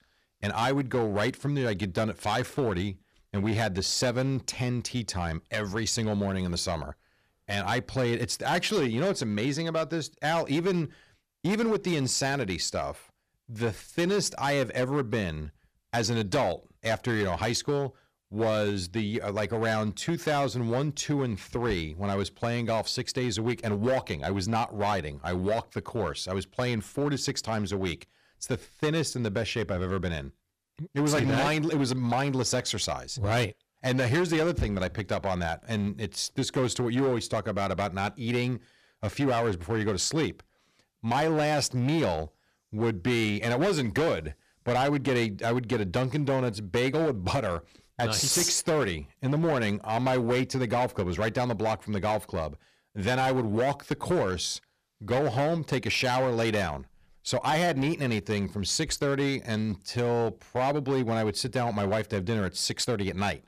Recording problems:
distortion; slight; 9% of the sound clipped

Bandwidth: 14.5 kHz